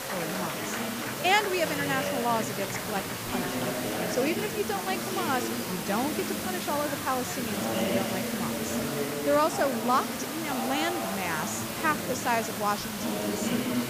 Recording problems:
murmuring crowd; loud; throughout; 3 dB below the speech
hiss; loud; throughout; 5 dB below the speech

